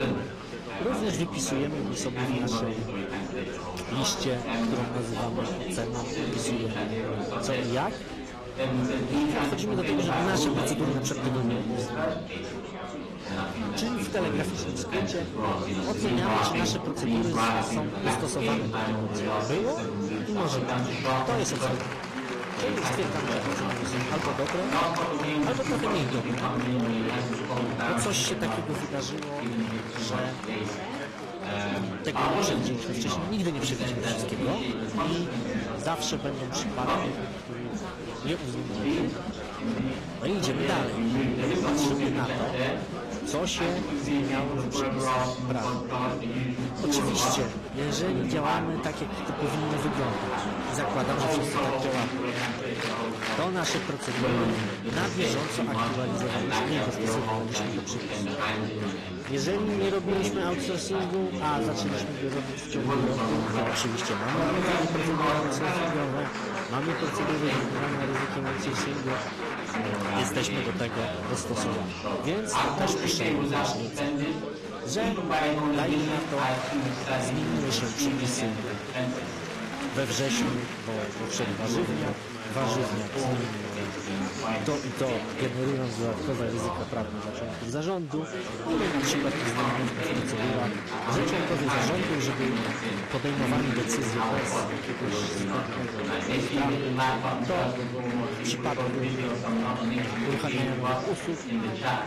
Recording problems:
distortion; slight; 9% of the sound clipped
garbled, watery; slightly
chatter from many people; very loud; throughout; 2 dB above the speech

